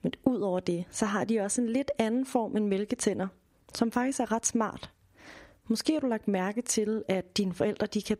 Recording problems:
squashed, flat; somewhat

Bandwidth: 15.5 kHz